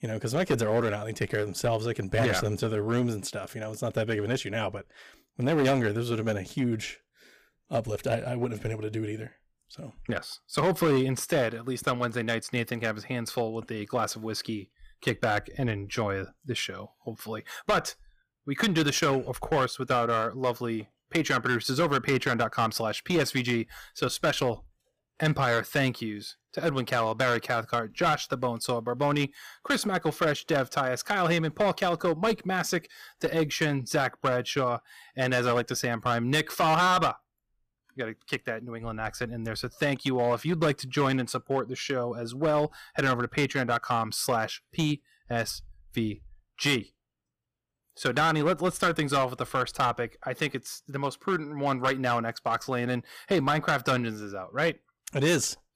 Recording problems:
distortion; slight; 6% of the sound clipped

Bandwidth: 15 kHz